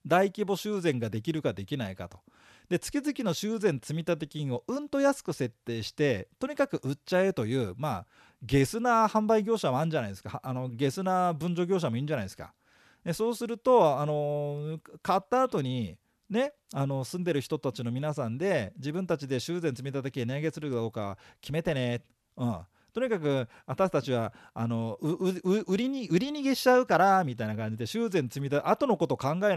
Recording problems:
abrupt cut into speech; at the end

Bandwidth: 13.5 kHz